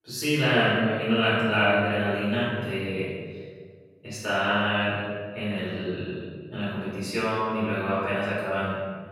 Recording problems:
room echo; strong; dies away in 1.5 s
off-mic speech; far

